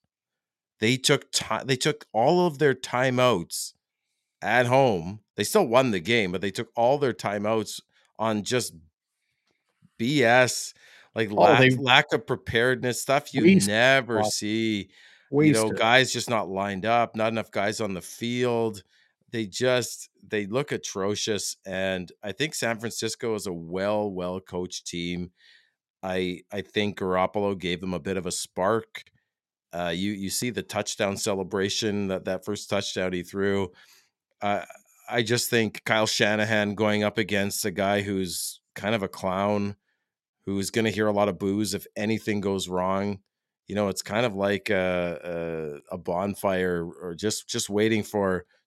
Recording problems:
none

